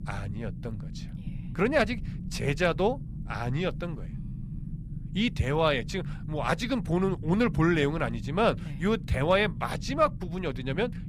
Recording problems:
low rumble; faint; throughout; 20 dB below the speech

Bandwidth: 14.5 kHz